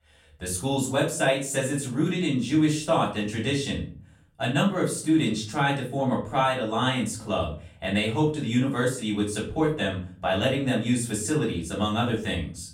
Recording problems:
off-mic speech; far
room echo; slight; dies away in 0.5 s

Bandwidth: 16 kHz